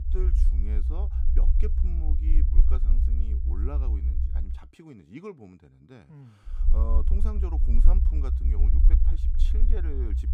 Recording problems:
low rumble; loud; until 4.5 s and from 6.5 s on; 2 dB below the speech

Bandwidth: 14.5 kHz